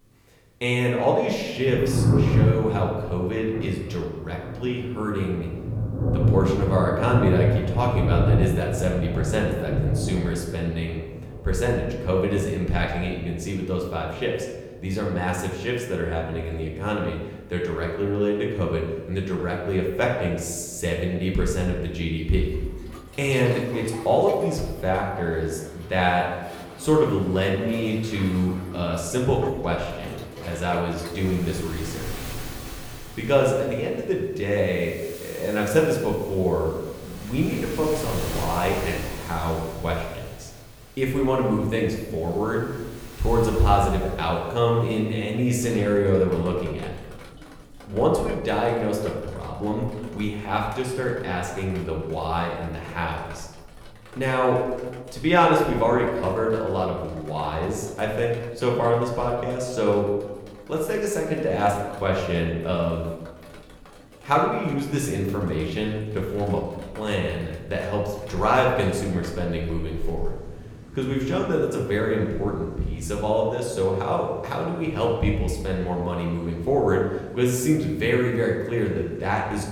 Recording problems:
room echo; noticeable; dies away in 1 s
off-mic speech; somewhat distant
rain or running water; loud; throughout; 6 dB below the speech

